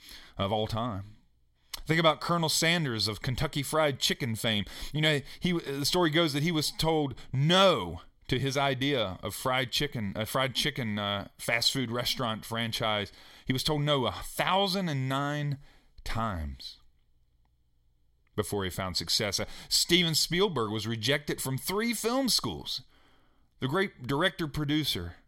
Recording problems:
none

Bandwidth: 16 kHz